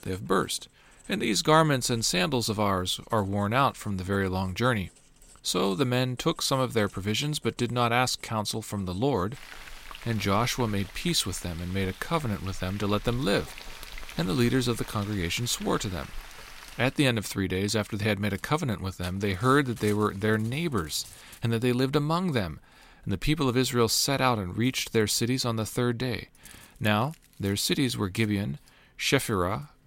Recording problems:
household noises; noticeable; throughout; 20 dB below the speech

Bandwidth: 16 kHz